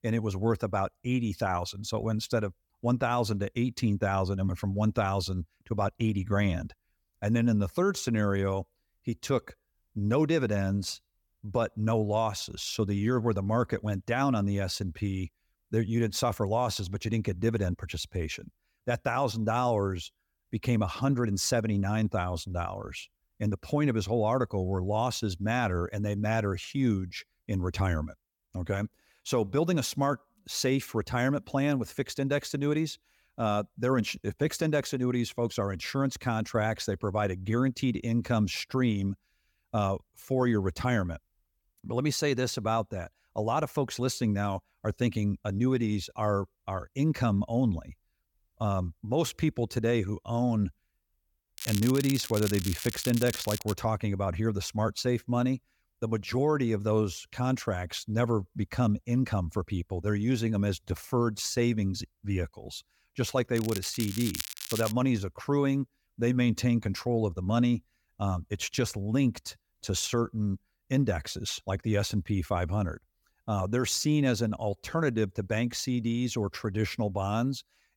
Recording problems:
crackling; loud; from 52 to 54 s and from 1:04 to 1:05; 7 dB below the speech

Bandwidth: 18 kHz